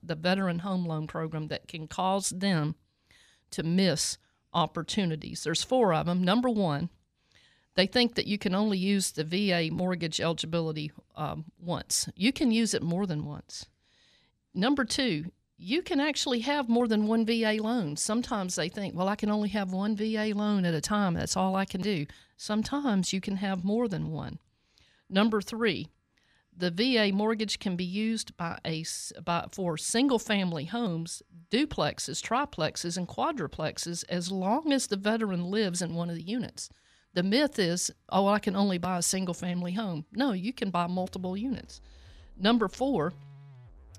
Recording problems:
background music; faint; throughout; 25 dB below the speech

